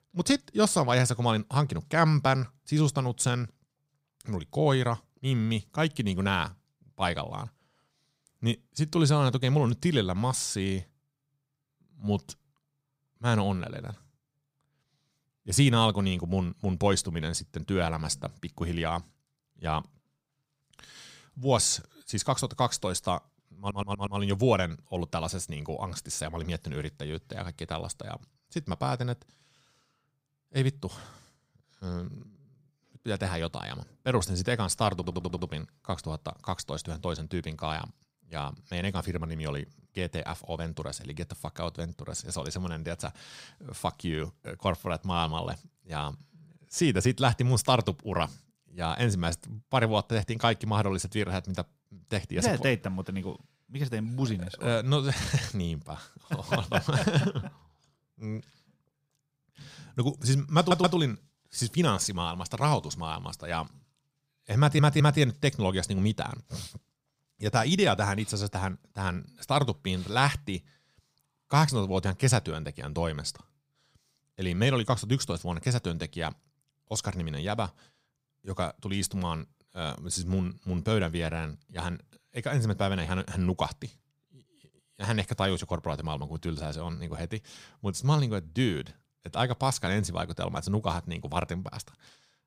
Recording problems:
audio stuttering; 4 times, first at 24 s

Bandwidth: 15.5 kHz